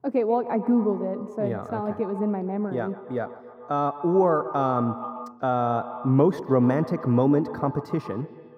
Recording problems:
echo of what is said; strong; throughout; 130 ms later, 10 dB below the speech
muffled; very; fading above 1.5 kHz

